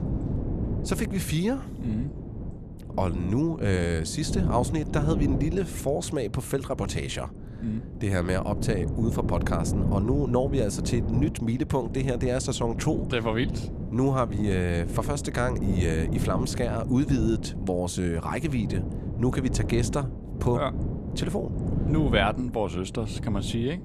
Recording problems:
wind noise on the microphone; heavy; 9 dB below the speech

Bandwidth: 13.5 kHz